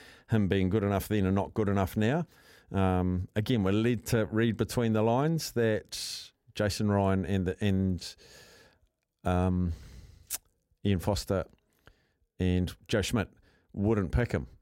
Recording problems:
none

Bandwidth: 16 kHz